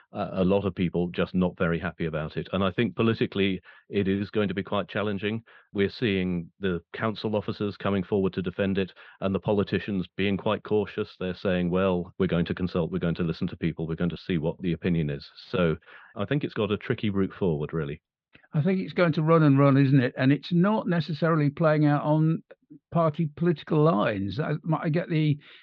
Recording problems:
muffled; slightly; fading above 4 kHz

